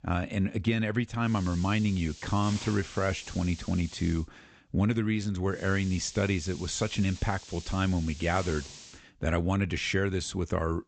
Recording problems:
high frequencies cut off; noticeable; nothing above 8 kHz
hiss; noticeable; from 1.5 to 4 s and from 5.5 to 9 s; 15 dB below the speech

